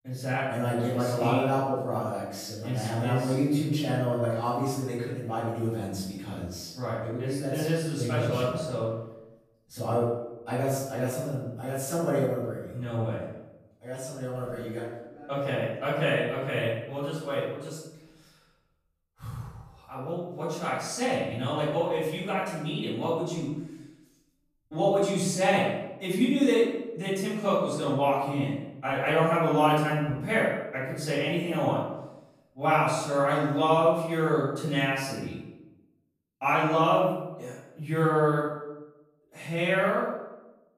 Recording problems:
off-mic speech; far
room echo; noticeable; dies away in 0.8 s

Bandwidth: 14.5 kHz